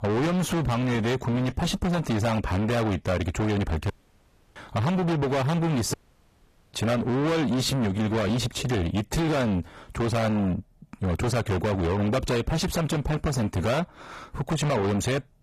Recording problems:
distortion; heavy; 6 dB below the speech
garbled, watery; slightly; nothing above 14.5 kHz
audio cutting out; at 4 s for 0.5 s and at 6 s for 1 s

